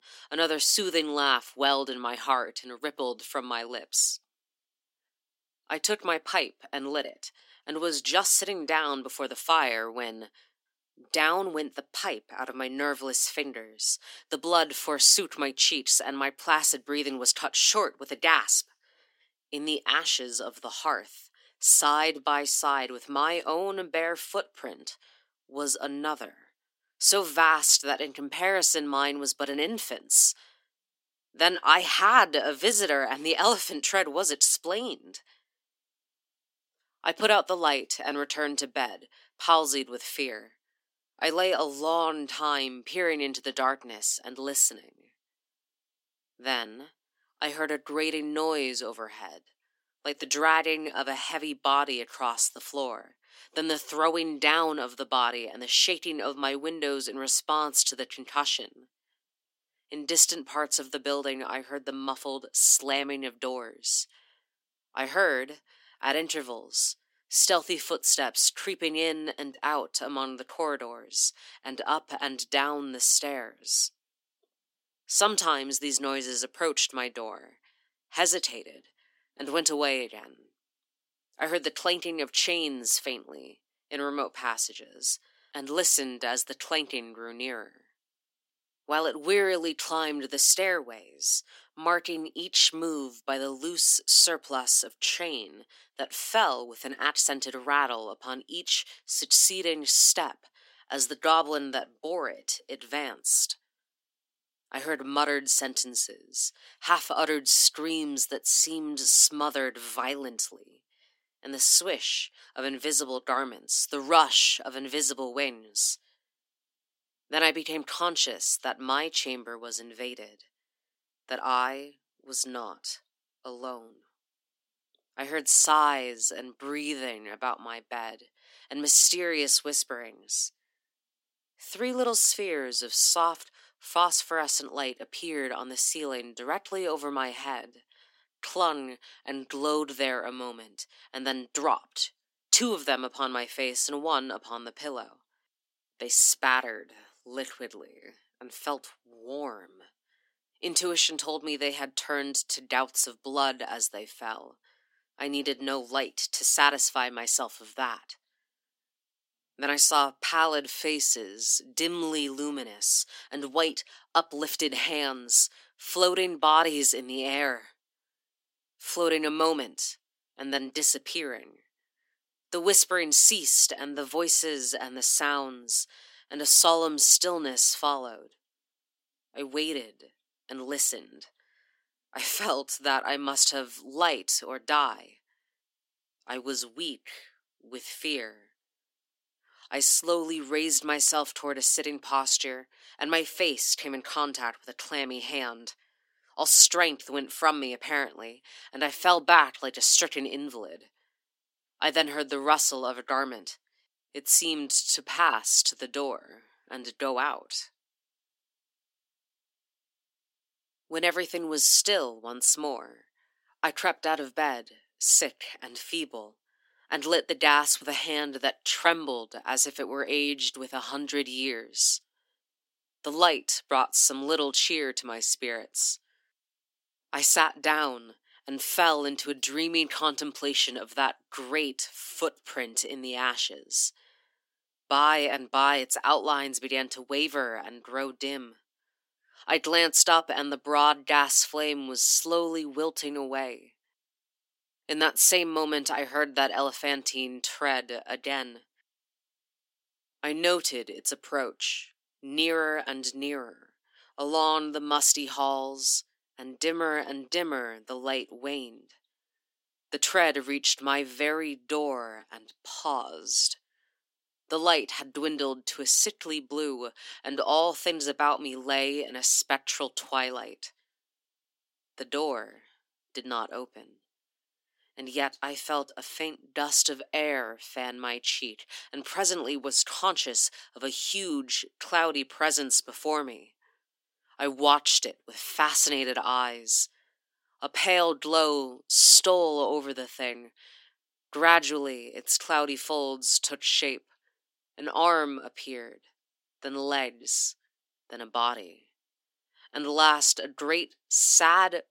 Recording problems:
thin; very slightly; fading below 250 Hz

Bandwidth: 16 kHz